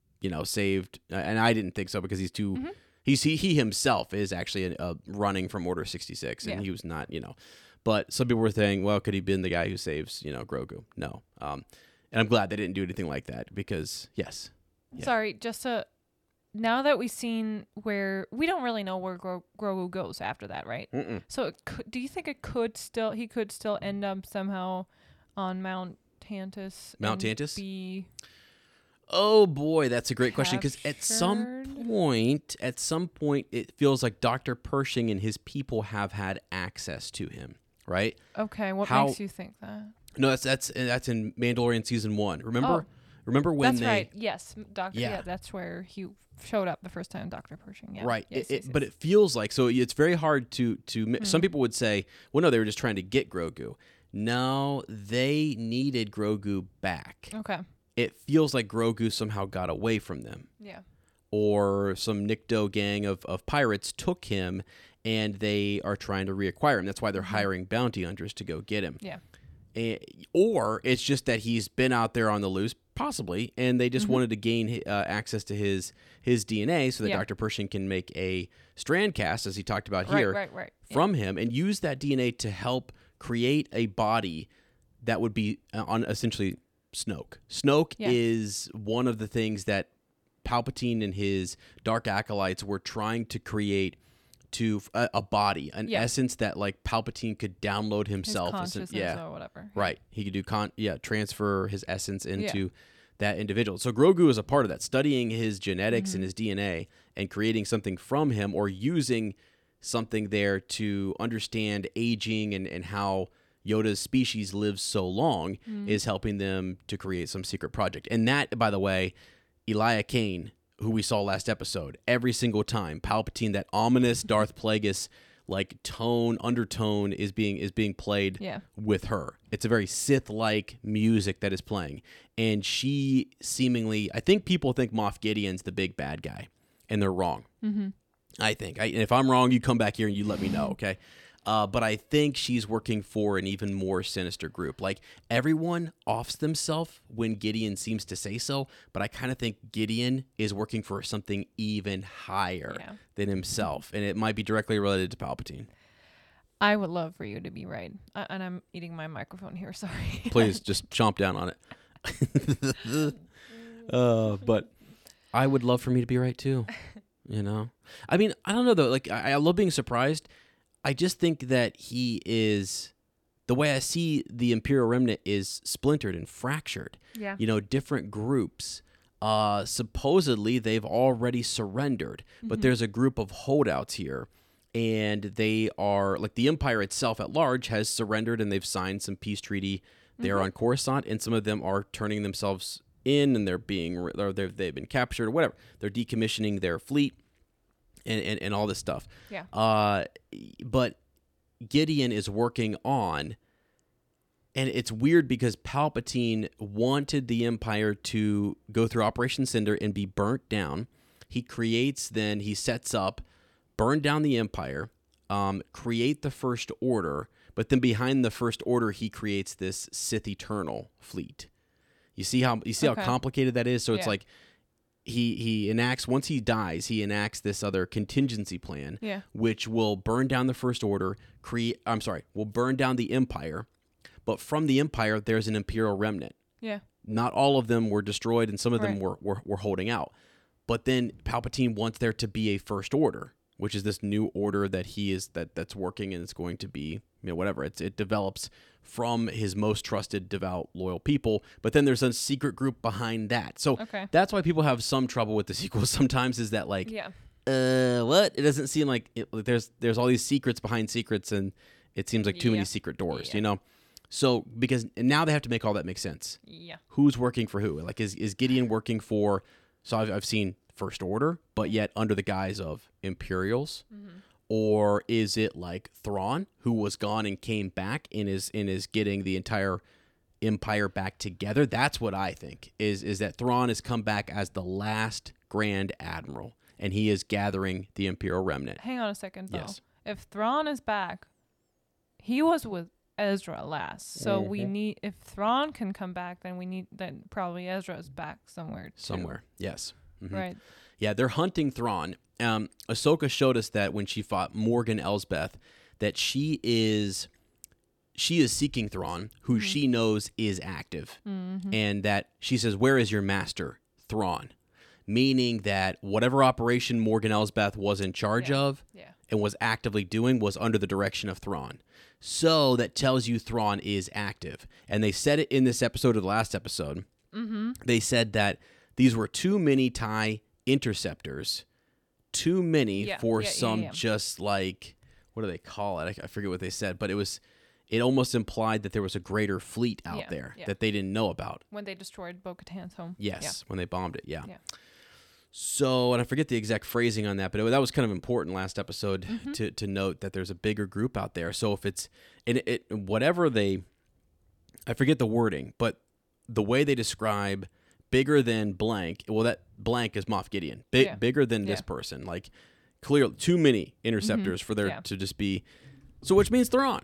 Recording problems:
none

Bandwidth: 18 kHz